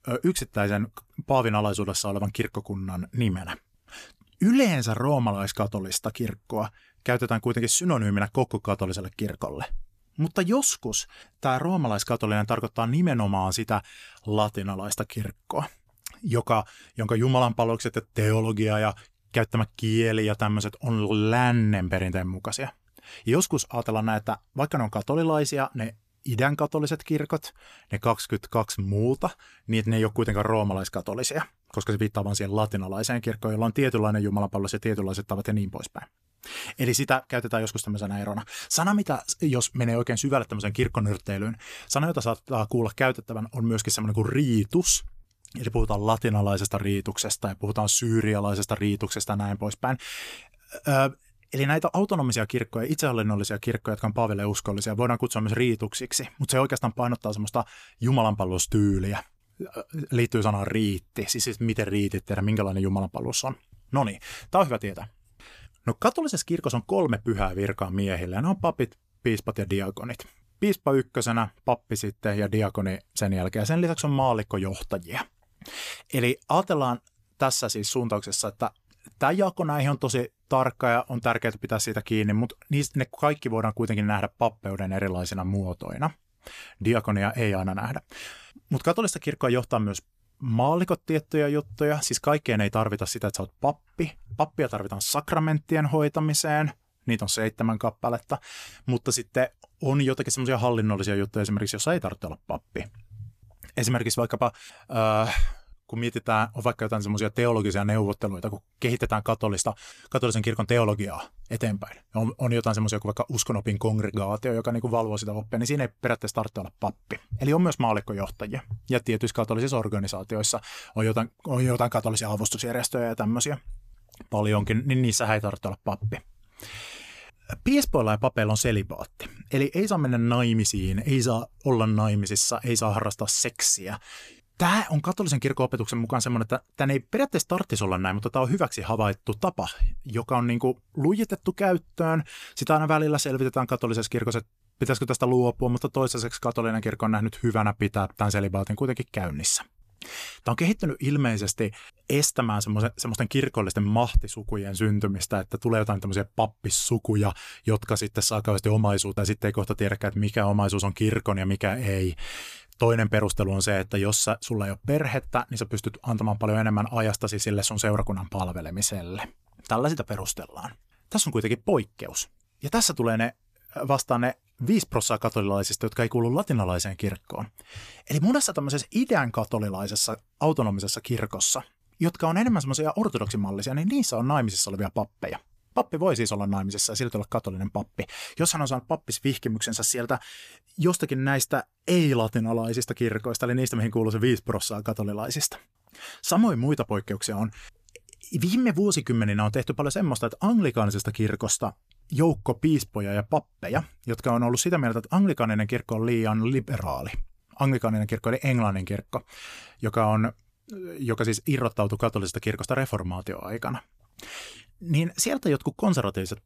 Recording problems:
none

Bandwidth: 14.5 kHz